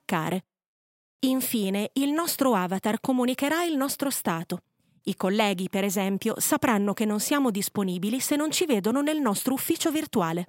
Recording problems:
none

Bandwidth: 16 kHz